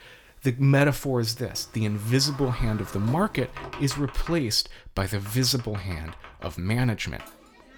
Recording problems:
household noises; noticeable; throughout; 15 dB below the speech

